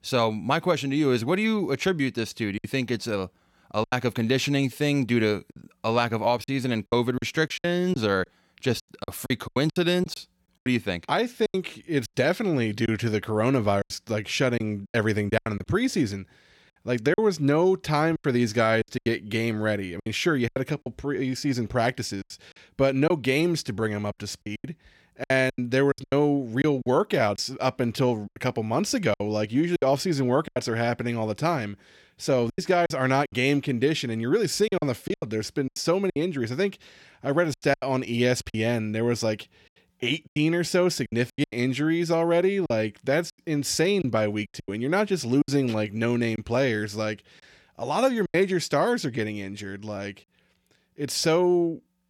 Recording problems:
choppy; very; 9% of the speech affected

